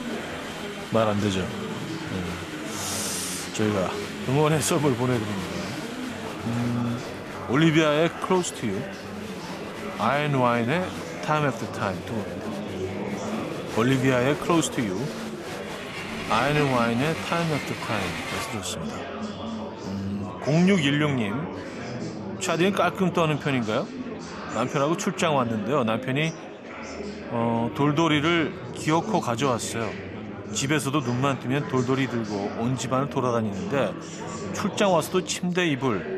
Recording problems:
murmuring crowd; loud; throughout; 8 dB below the speech

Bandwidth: 14 kHz